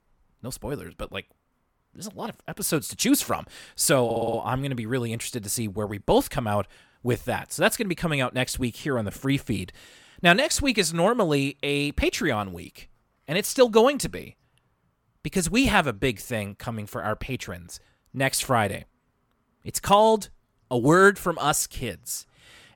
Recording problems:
audio stuttering; at 4 s

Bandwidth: 17.5 kHz